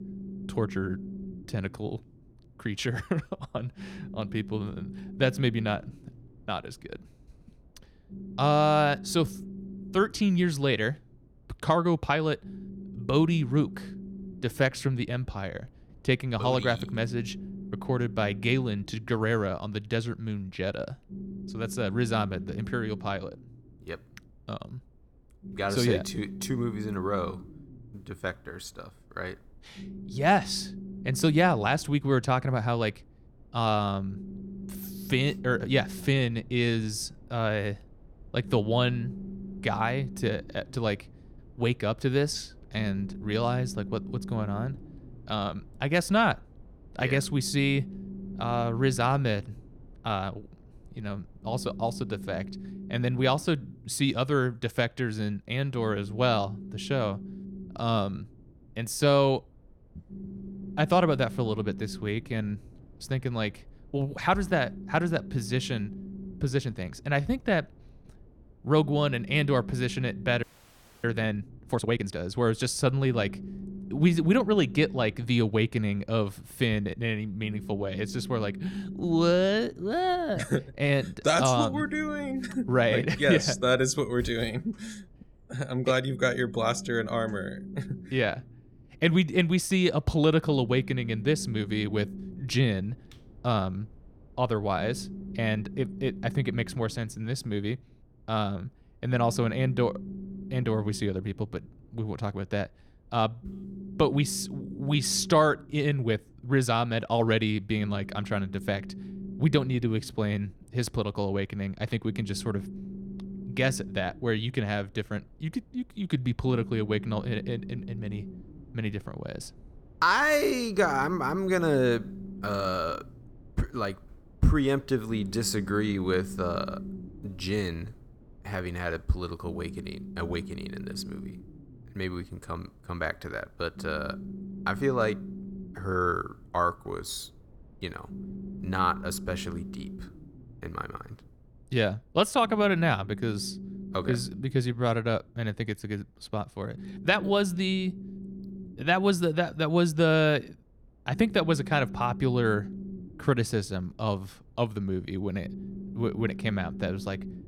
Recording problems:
low rumble; noticeable; throughout; 20 dB below the speech
audio freezing; at 1:10 for 0.5 s

